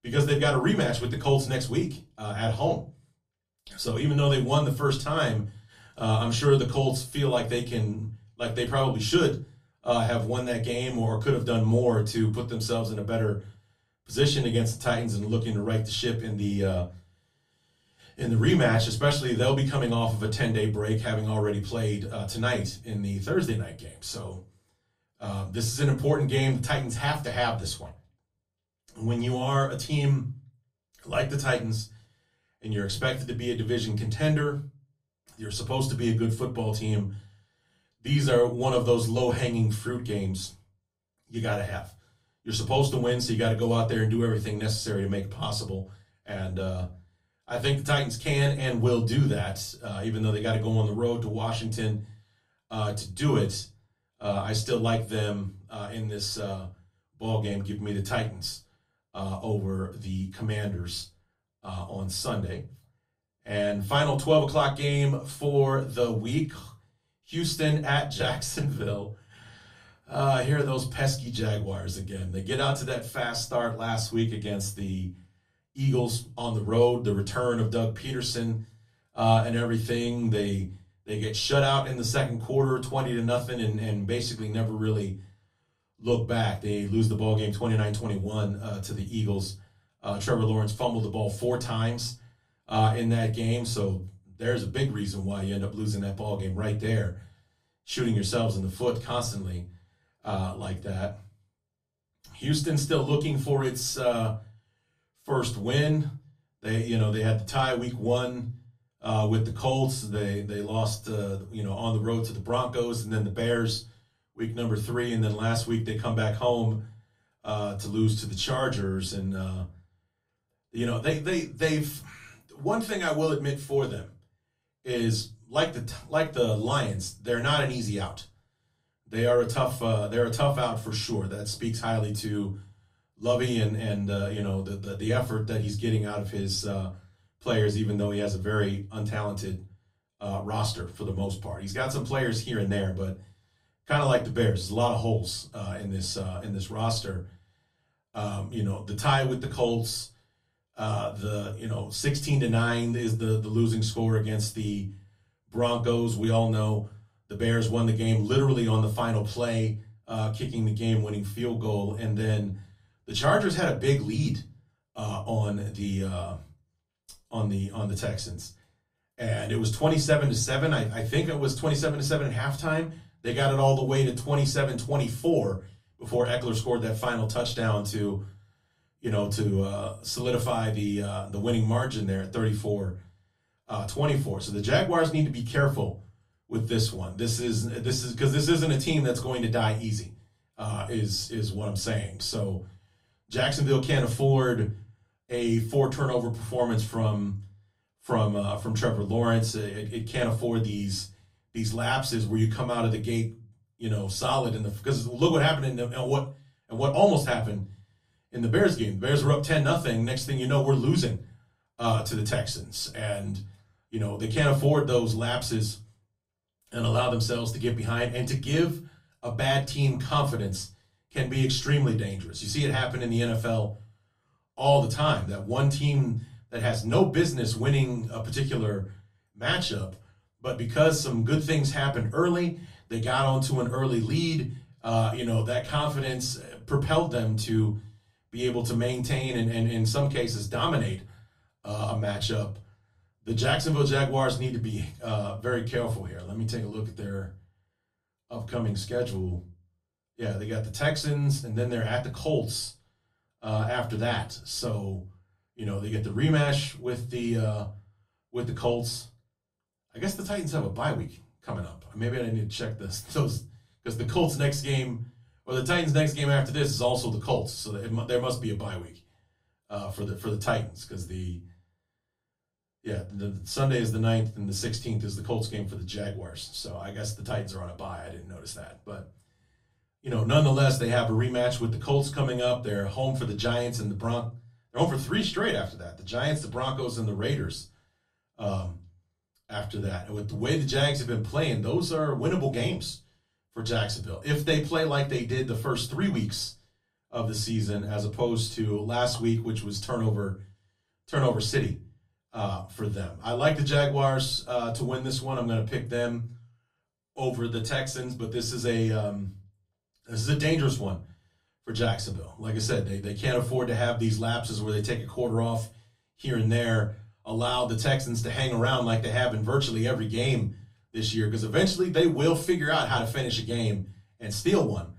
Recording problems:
off-mic speech; far
room echo; very slight; dies away in 0.3 s

